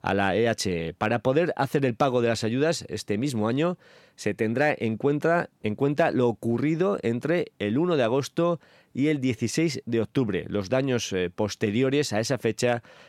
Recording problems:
none

